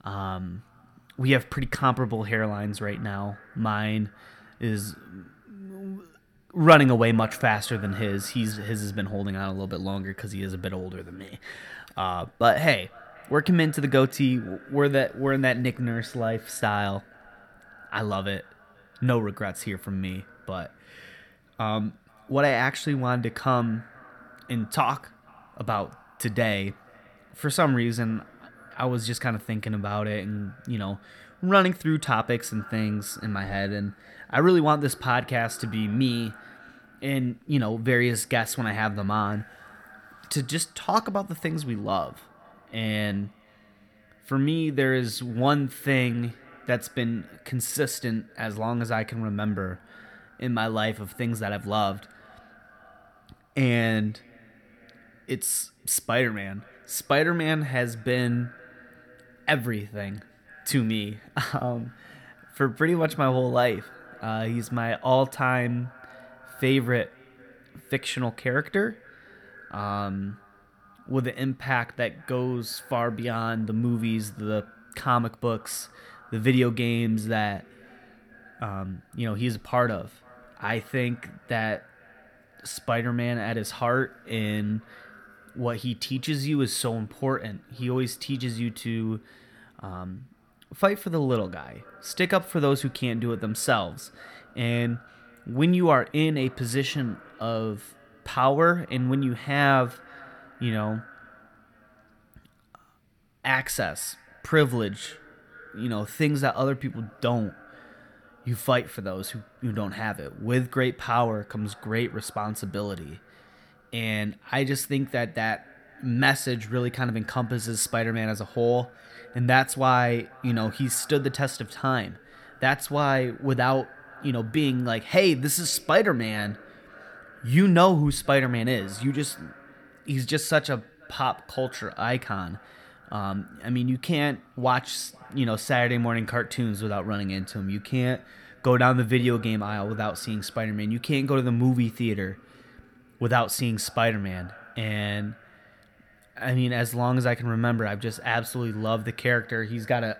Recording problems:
echo of what is said; faint; throughout; 480 ms later, 25 dB below the speech

